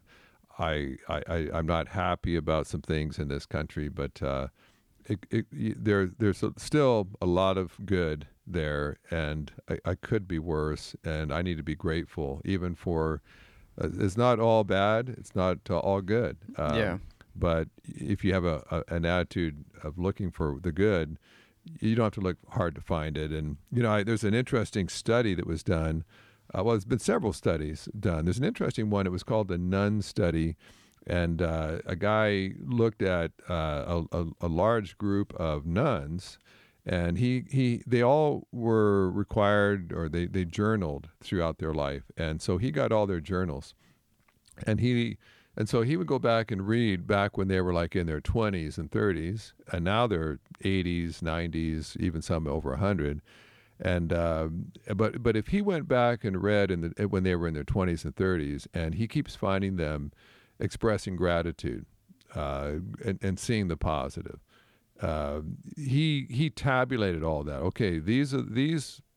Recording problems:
none

